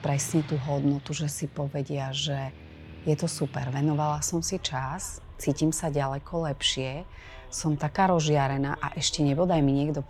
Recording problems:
traffic noise; noticeable; throughout; 20 dB below the speech

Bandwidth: 17 kHz